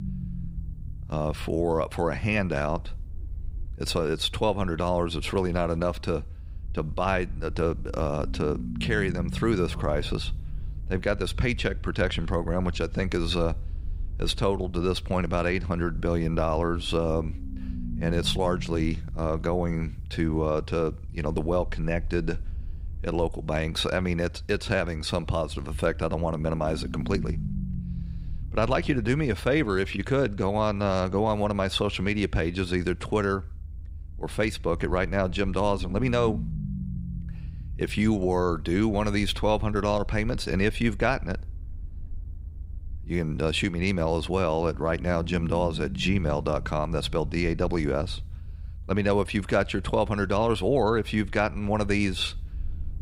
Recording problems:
low rumble; faint; throughout; 20 dB below the speech

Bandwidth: 15.5 kHz